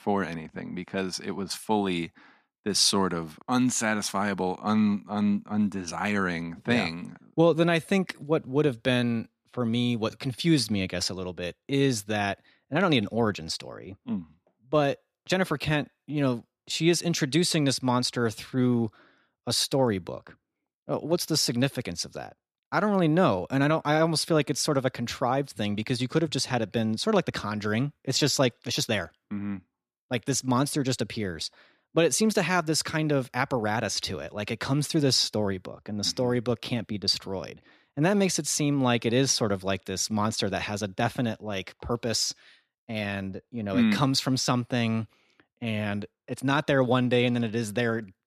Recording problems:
none

